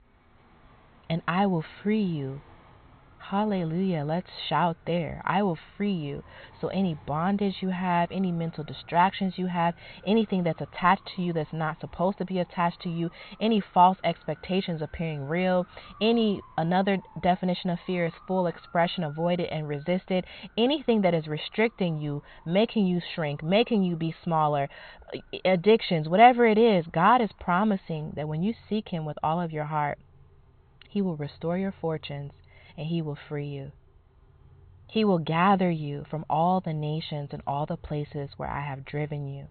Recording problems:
high frequencies cut off; severe; nothing above 4.5 kHz
traffic noise; faint; throughout; 30 dB below the speech

